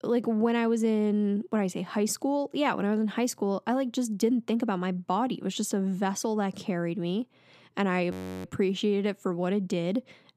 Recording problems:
audio freezing; at 8 s

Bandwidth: 14.5 kHz